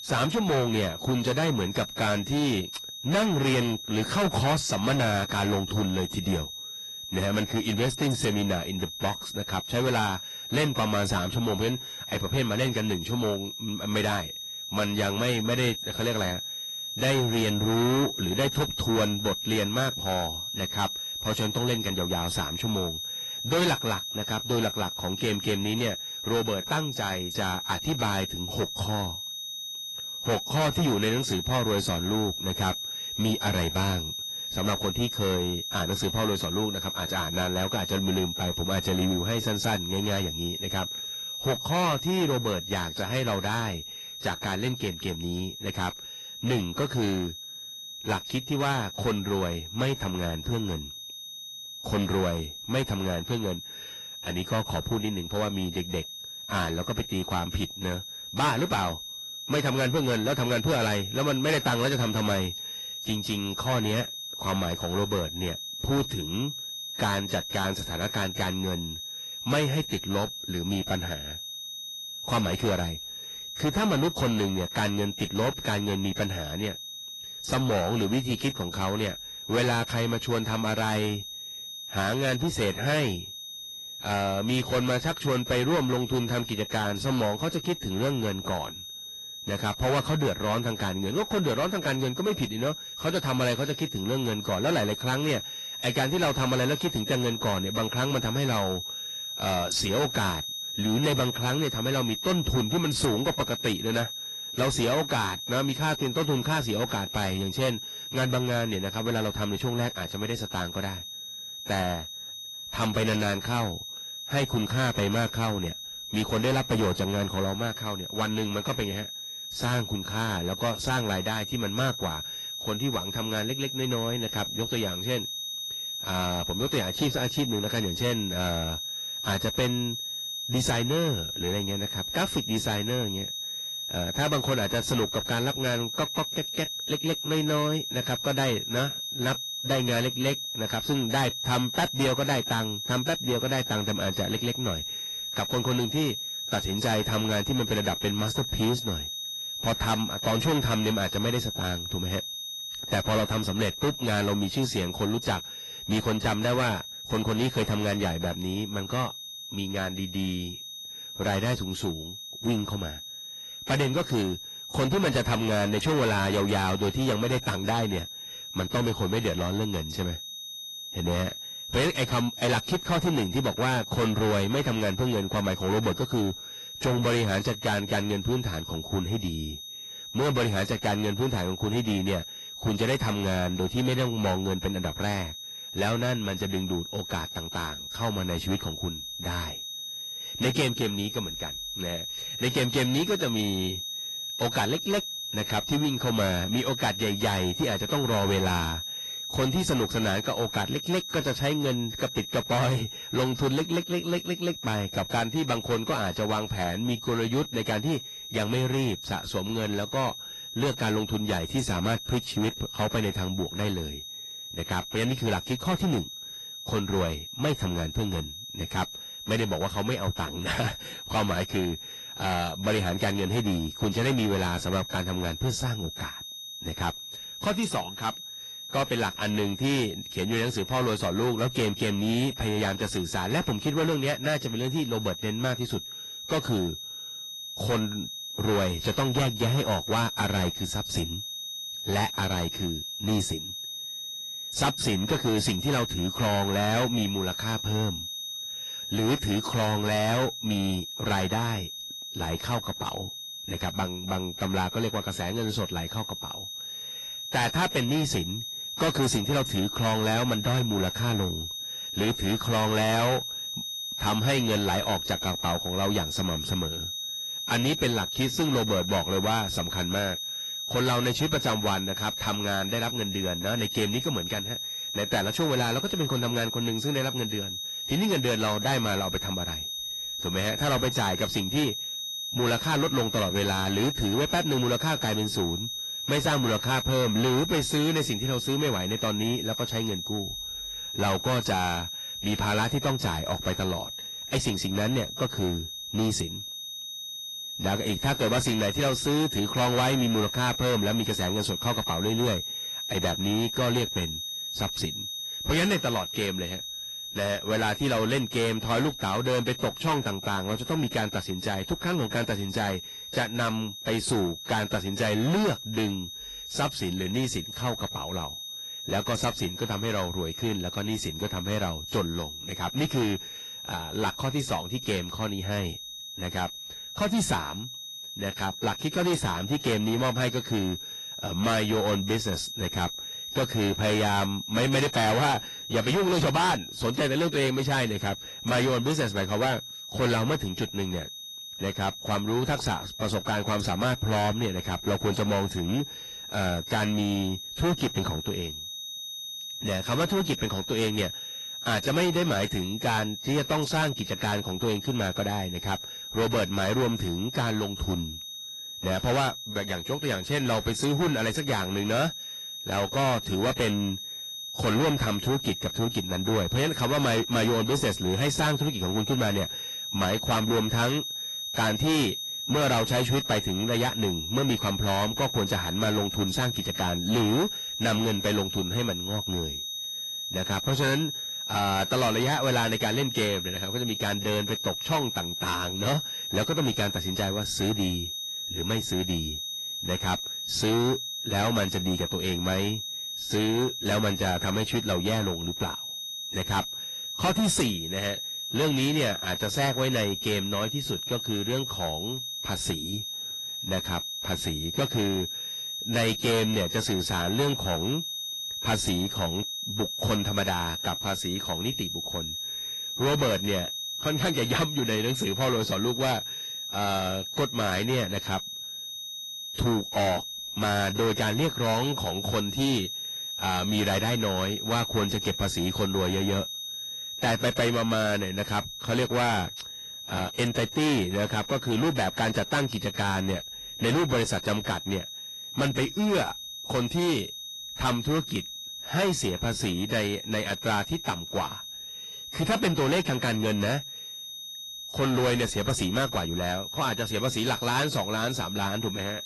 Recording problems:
distortion; heavy; 11% of the sound clipped
garbled, watery; slightly; nothing above 11 kHz
high-pitched whine; loud; throughout; 3.5 kHz, 6 dB below the speech

